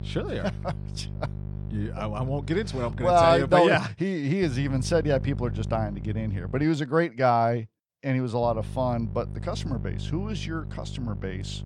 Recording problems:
electrical hum; faint; until 3.5 s, from 4.5 to 6.5 s and from 8.5 s on; 50 Hz, 20 dB below the speech

